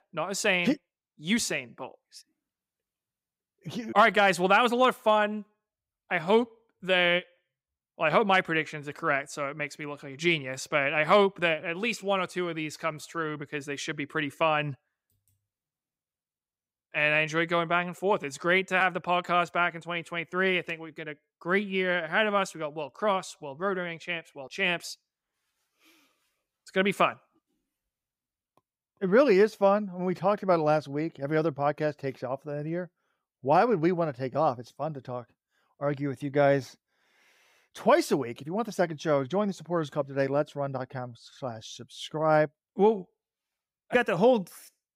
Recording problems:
none

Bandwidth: 15.5 kHz